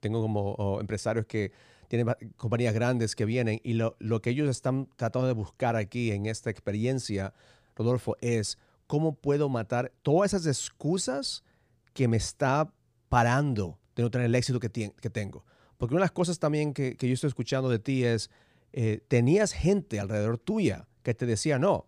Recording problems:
none

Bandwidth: 15 kHz